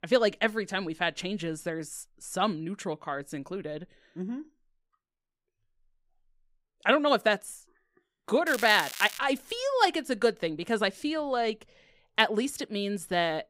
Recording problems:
crackling; loud; at 8.5 s; 9 dB below the speech

